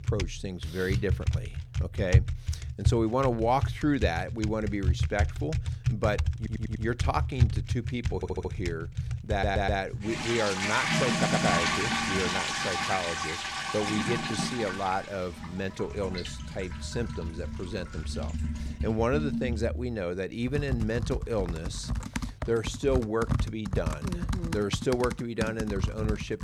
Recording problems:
household noises; loud; throughout; as loud as the speech
audio stuttering; 4 times, first at 6.5 s

